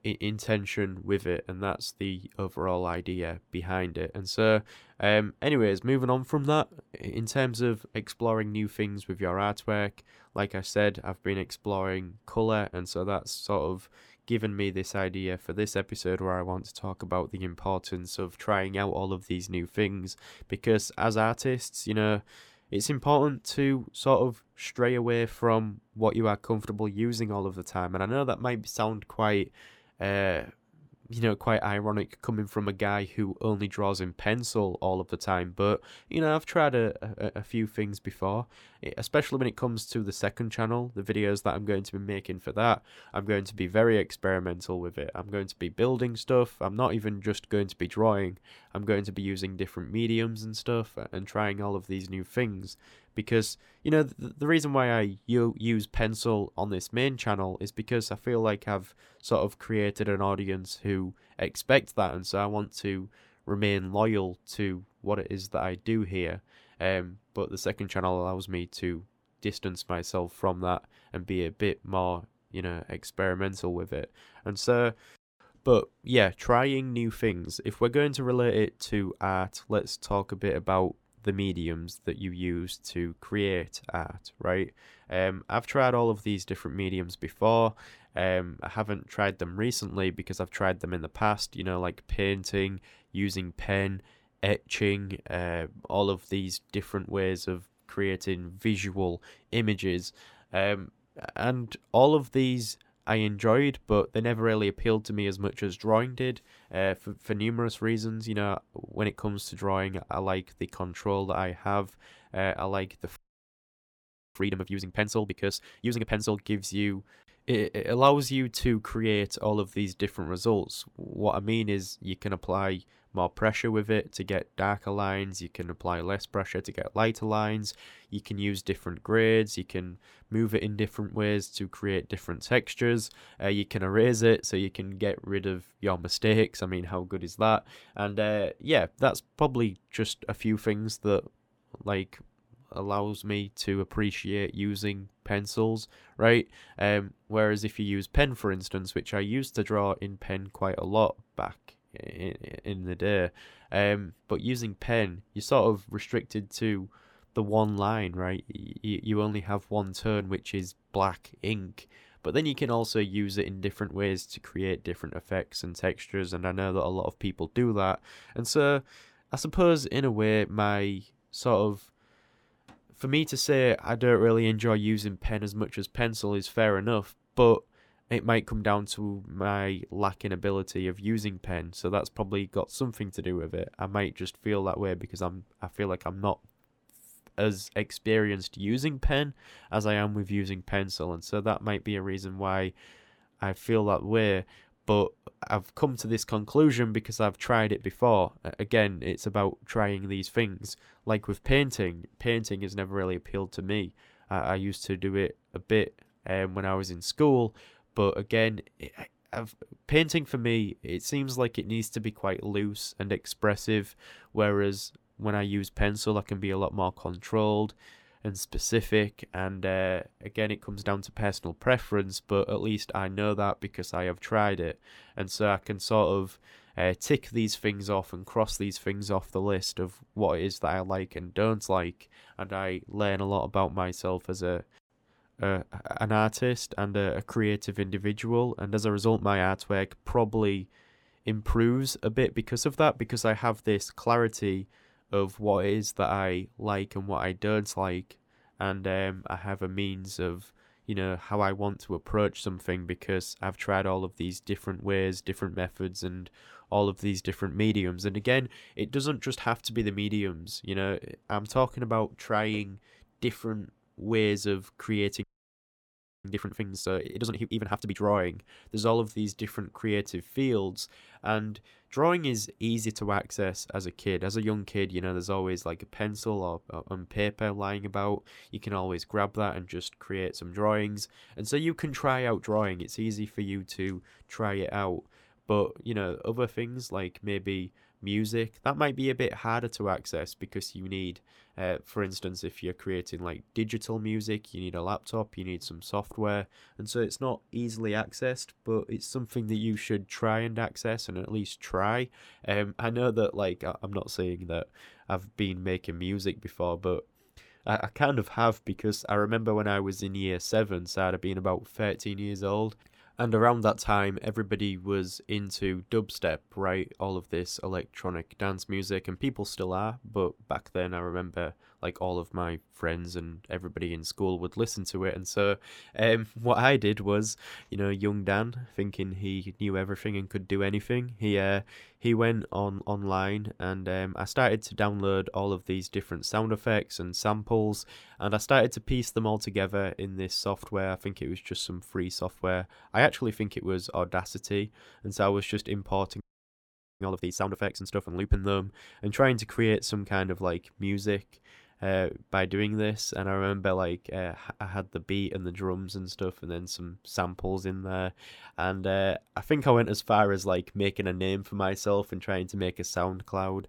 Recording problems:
audio freezing; at 1:53 for 1 s, at 4:25 for 1 s and at 5:46 for 1 s

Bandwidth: 17.5 kHz